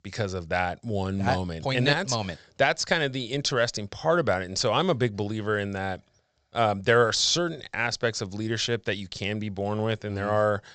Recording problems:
high frequencies cut off; noticeable; nothing above 8 kHz

